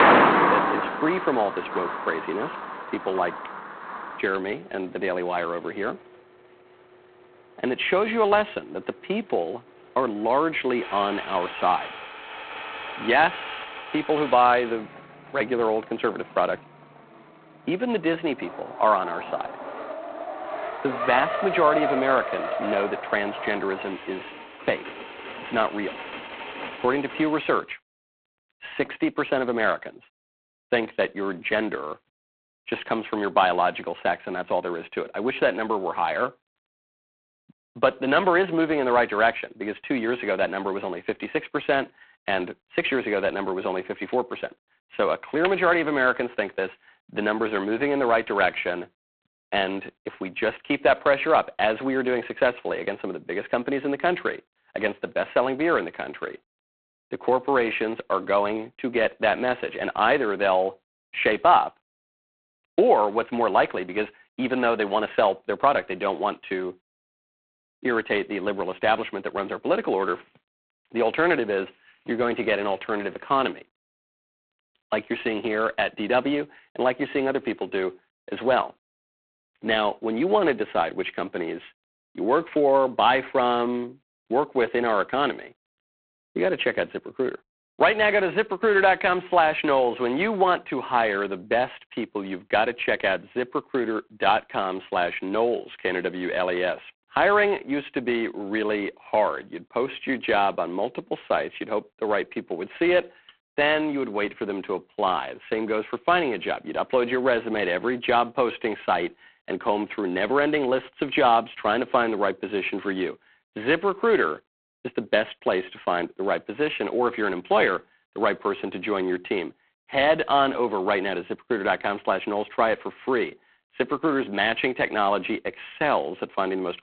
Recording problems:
phone-call audio; poor line; nothing above 3.5 kHz
traffic noise; loud; until 27 s; 5 dB below the speech

